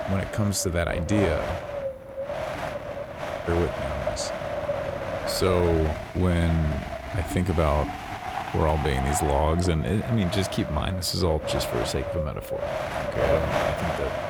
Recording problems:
wind noise on the microphone; heavy; 1 dB below the speech

